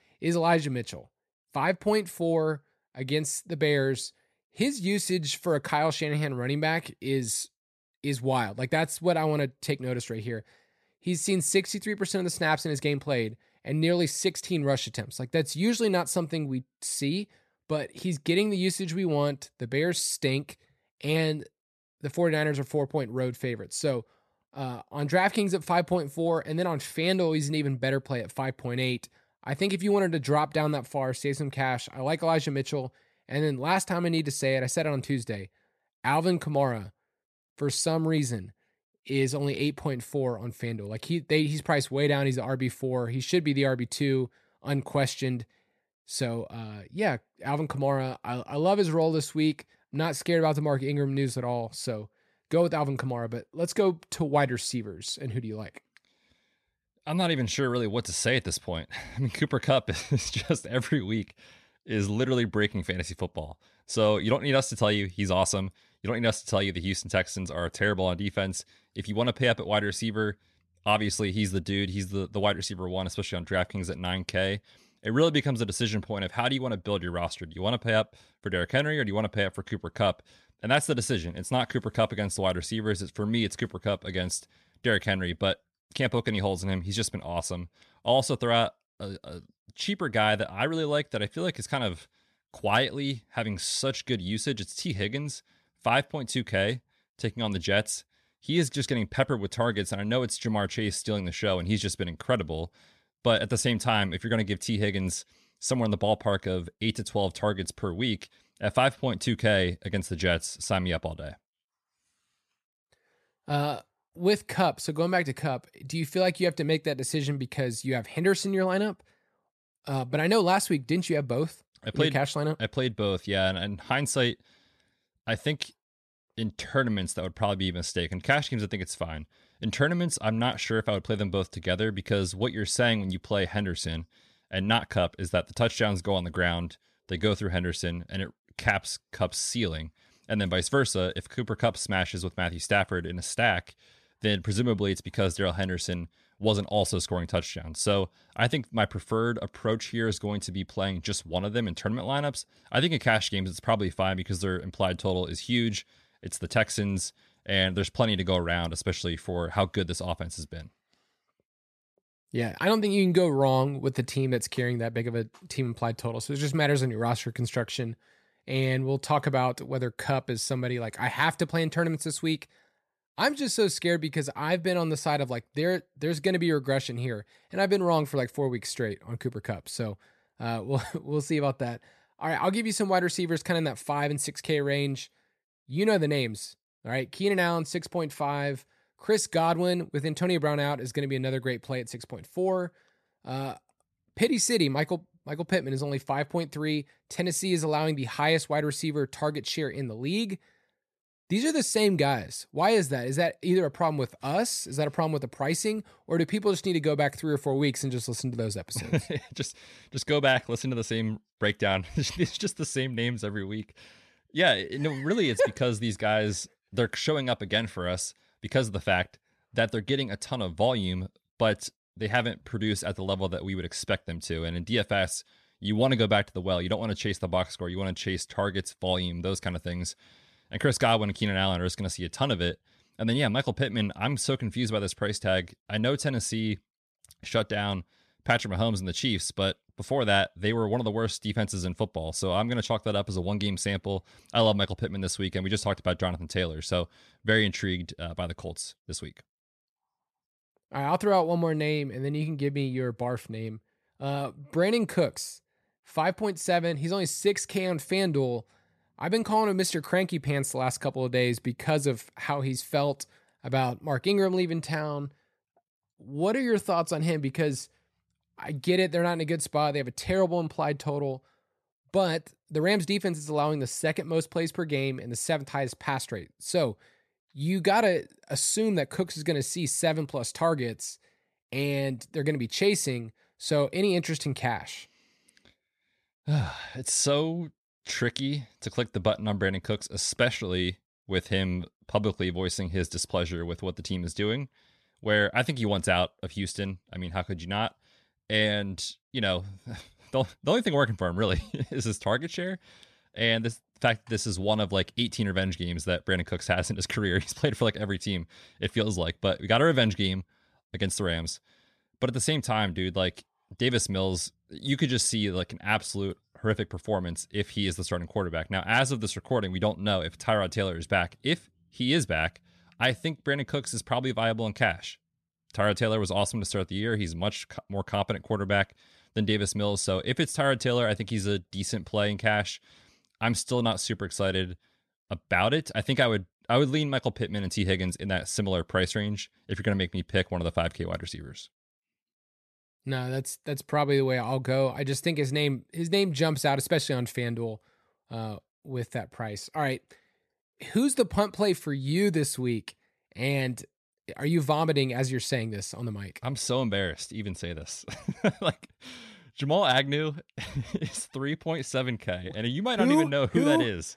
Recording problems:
none

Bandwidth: 13.5 kHz